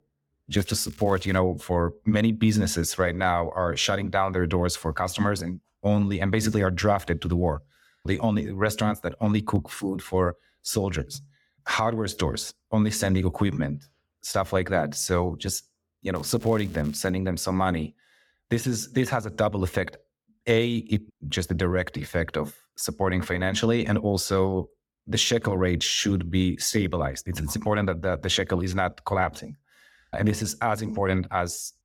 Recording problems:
crackling; faint; at 0.5 s and at 16 s; 25 dB below the speech

